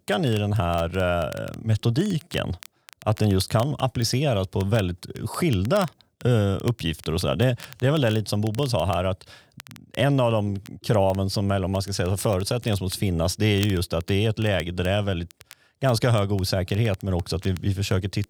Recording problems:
crackle, like an old record; faint; 20 dB below the speech

